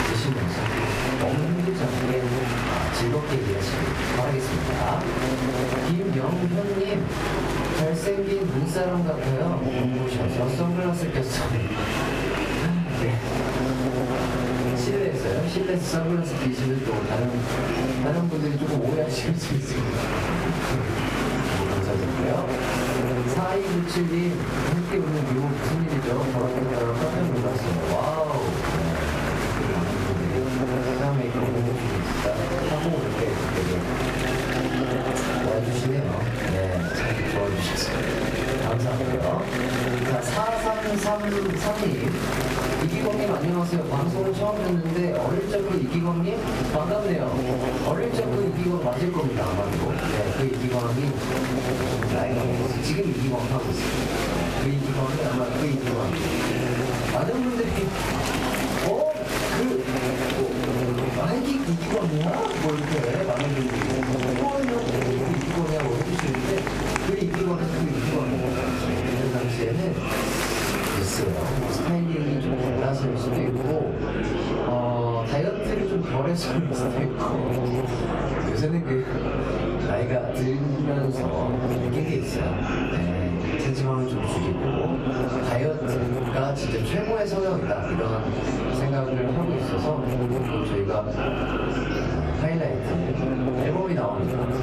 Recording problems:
off-mic speech; far
room echo; slight; dies away in 0.3 s
squashed, flat; somewhat
electrical hum; loud; throughout; 50 Hz, 5 dB below the speech
murmuring crowd; loud; throughout; 4 dB below the speech

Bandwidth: 14.5 kHz